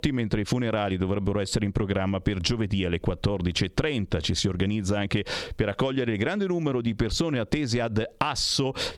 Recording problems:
squashed, flat; somewhat

